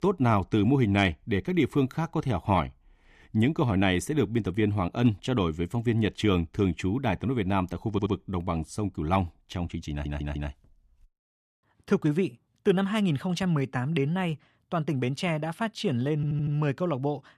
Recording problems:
audio stuttering; at 8 s, at 10 s and at 16 s

